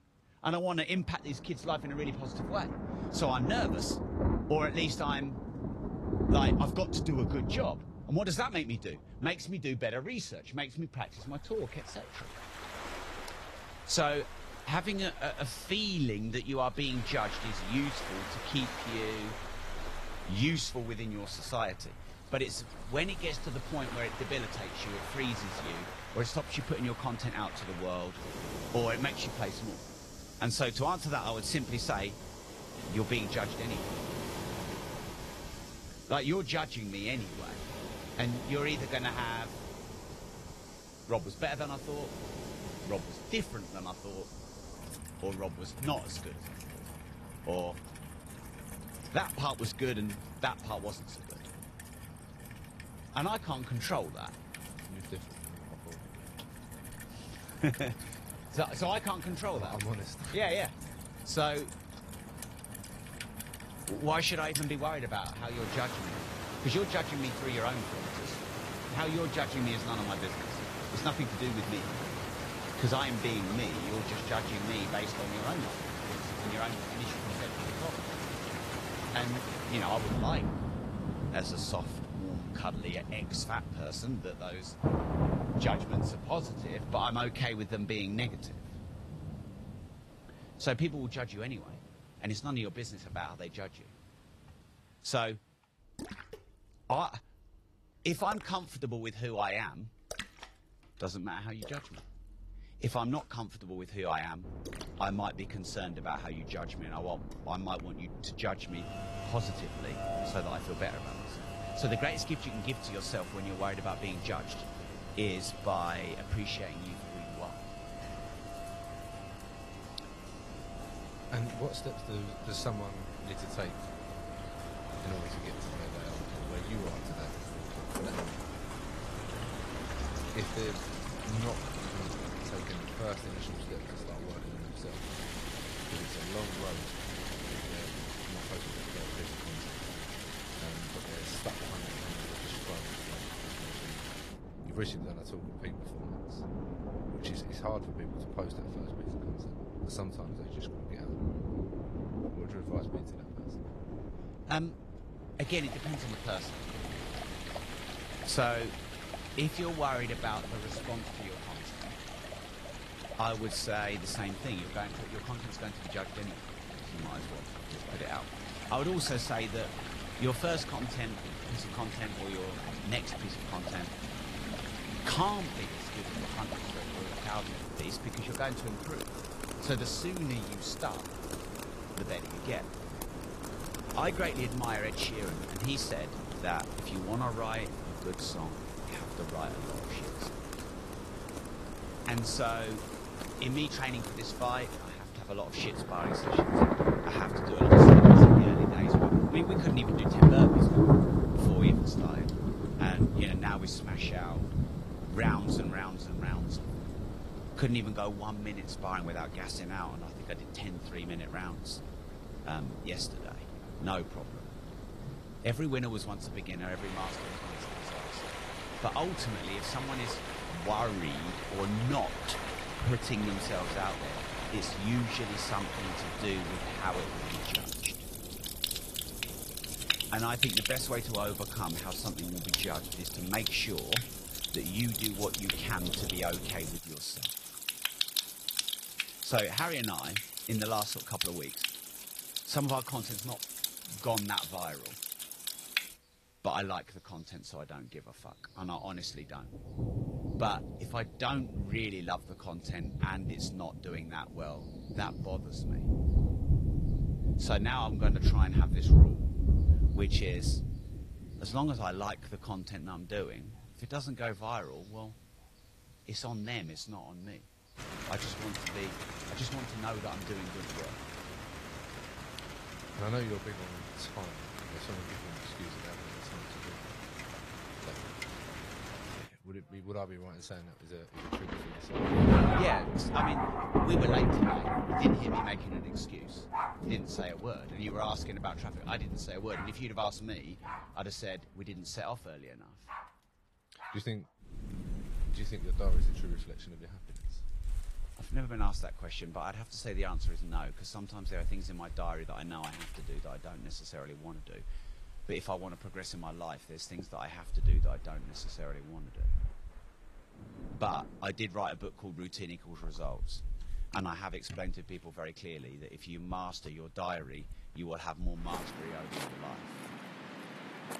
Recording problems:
garbled, watery; slightly; nothing above 15 kHz
rain or running water; very loud; throughout; 4 dB above the speech
wind noise on the microphone; occasional gusts; from 1:44 to 3:57; 15 dB below the speech

